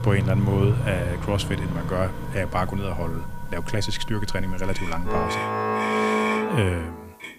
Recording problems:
background music; loud; throughout; as loud as the speech
traffic noise; loud; throughout; 2 dB below the speech
hiss; faint; throughout; 30 dB below the speech

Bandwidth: 15 kHz